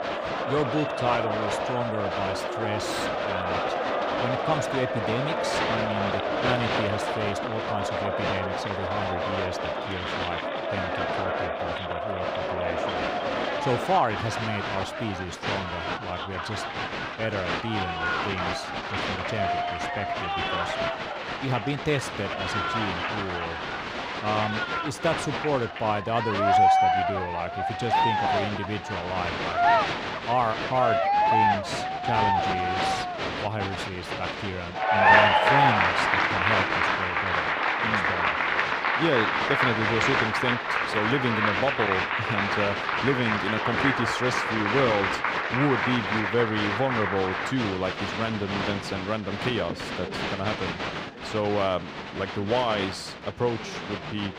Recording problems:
crowd noise; very loud; throughout; 4 dB above the speech

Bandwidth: 15 kHz